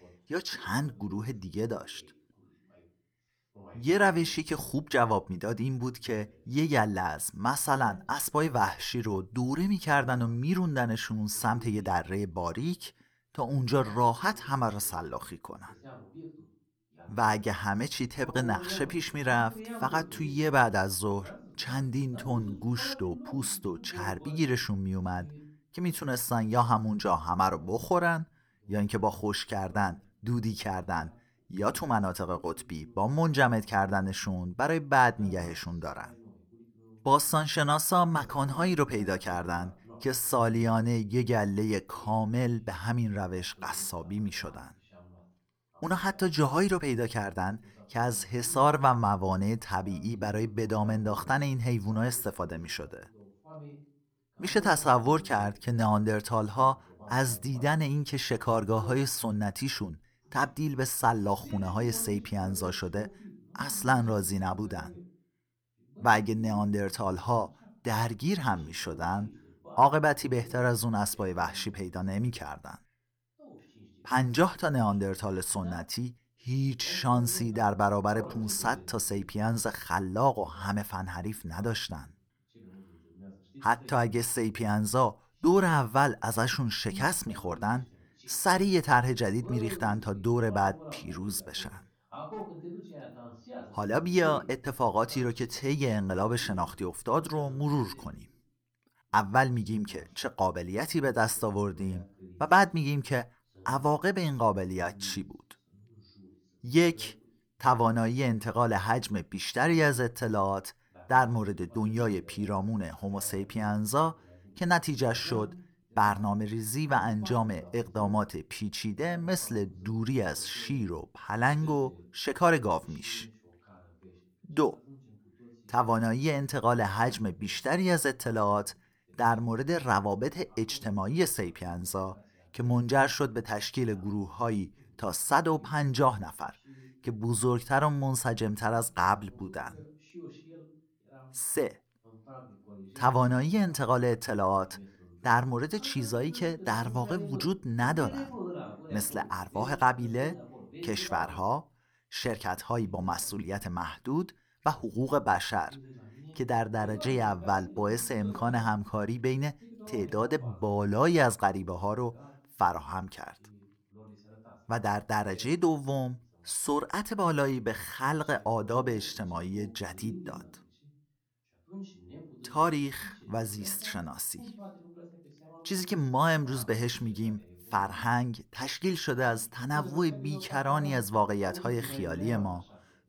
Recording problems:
voice in the background; noticeable; throughout; 20 dB below the speech

